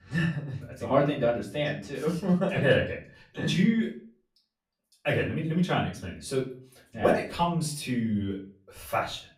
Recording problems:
off-mic speech; far
room echo; slight; dies away in 0.3 s

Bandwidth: 15.5 kHz